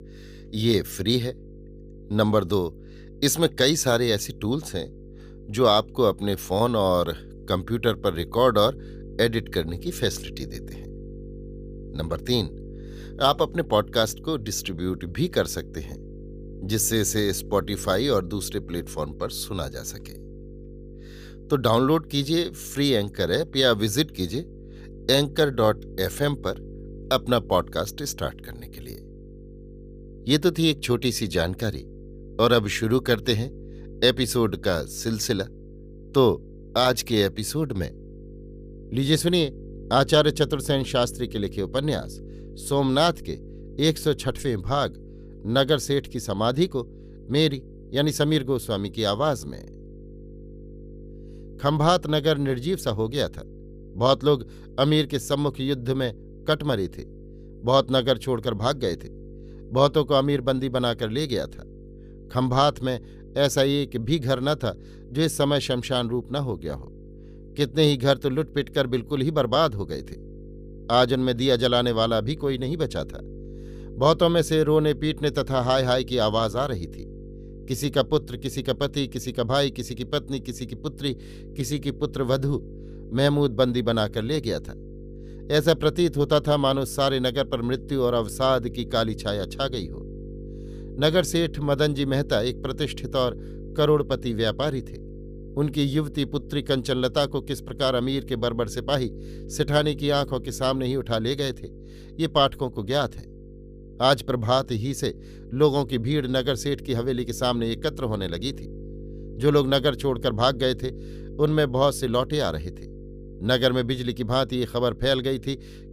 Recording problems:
electrical hum; faint; throughout; 50 Hz, 25 dB below the speech

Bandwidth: 15 kHz